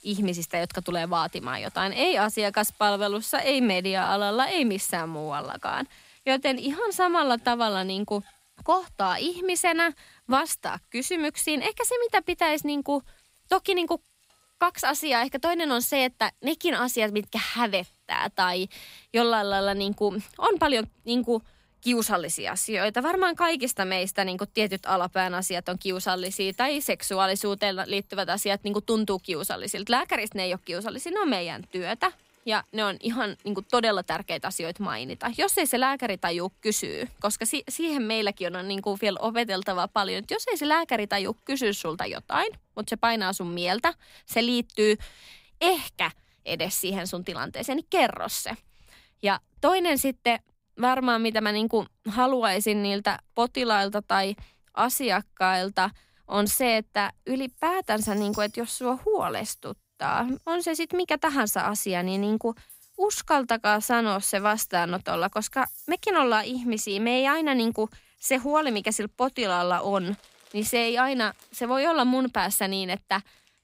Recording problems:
household noises; faint; throughout; 25 dB below the speech

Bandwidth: 15.5 kHz